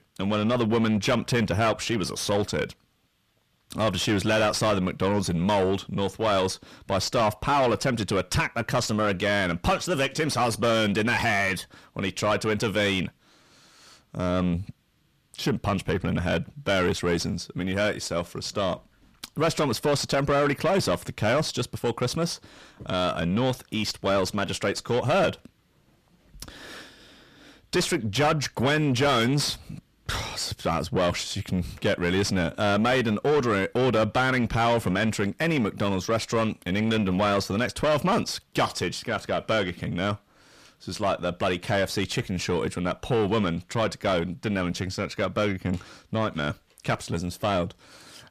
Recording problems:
distortion; heavy; 7 dB below the speech

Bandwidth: 14.5 kHz